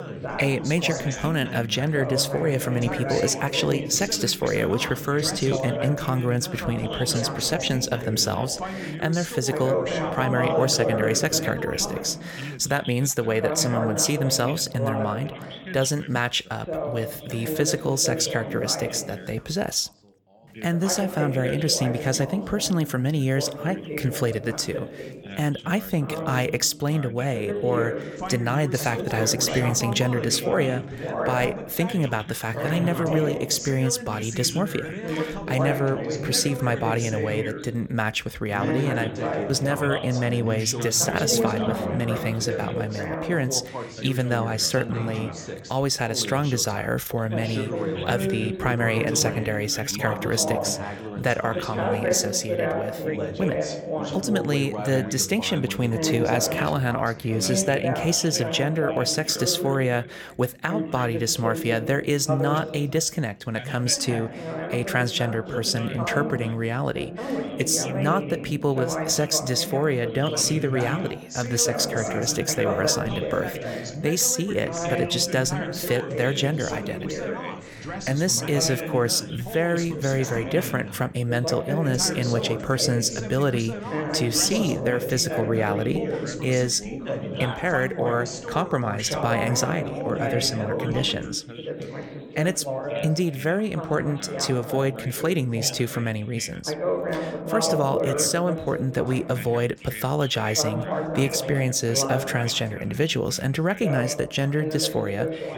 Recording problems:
background chatter; loud; throughout; 3 voices, 6 dB below the speech

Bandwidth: 17.5 kHz